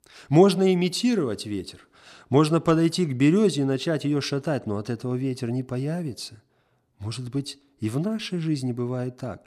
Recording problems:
none

